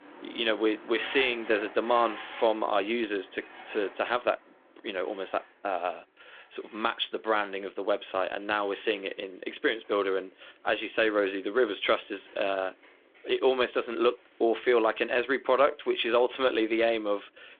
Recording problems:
phone-call audio; nothing above 3.5 kHz
traffic noise; noticeable; throughout; 20 dB below the speech

